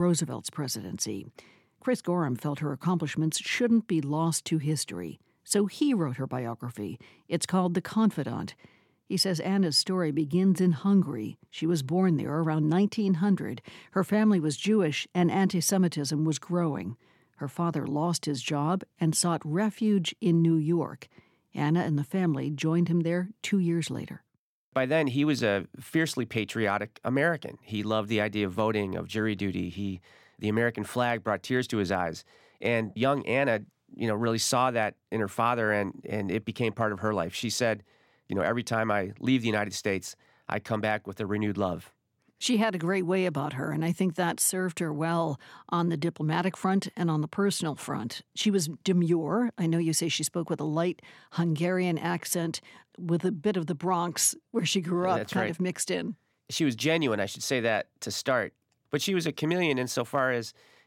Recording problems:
abrupt cut into speech; at the start

